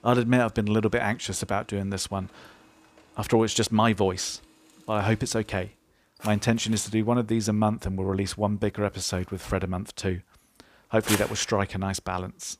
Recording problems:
household noises; loud; throughout; 9 dB below the speech

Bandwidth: 15 kHz